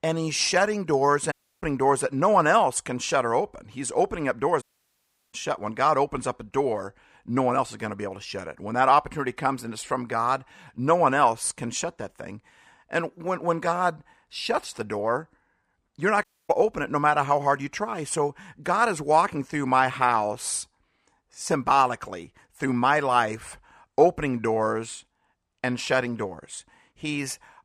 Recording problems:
audio cutting out; at 1.5 s, at 4.5 s for 0.5 s and at 16 s

